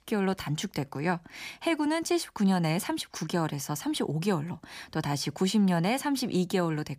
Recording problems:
none

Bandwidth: 15 kHz